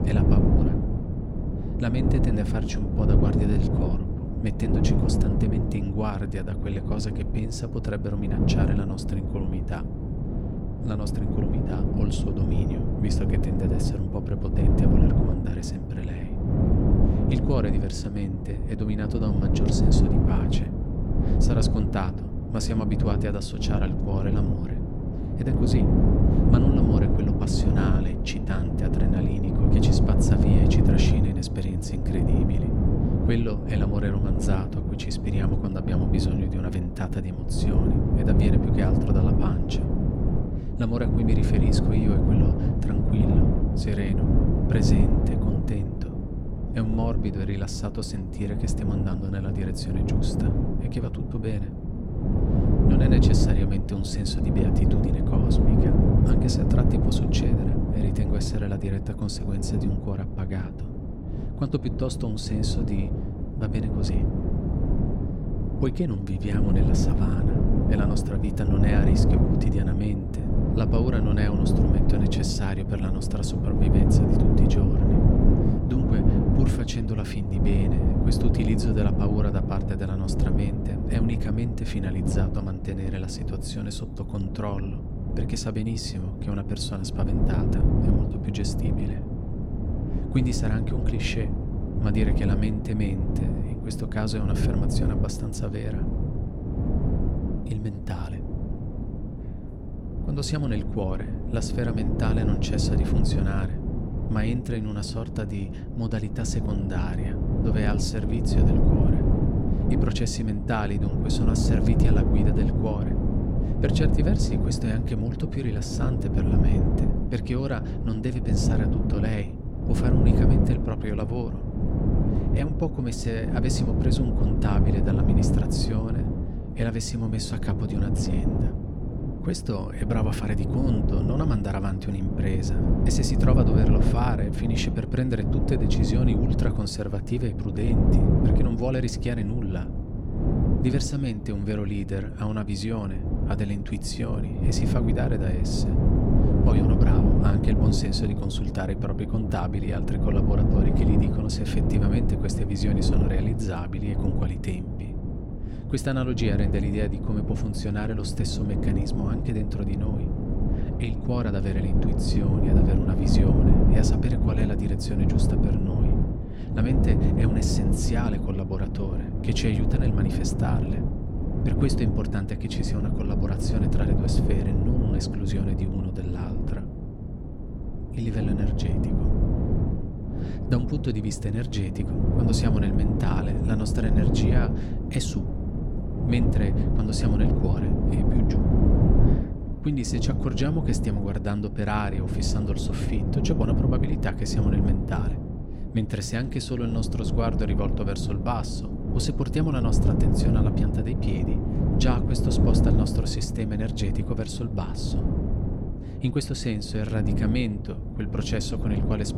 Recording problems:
wind noise on the microphone; heavy; 1 dB above the speech

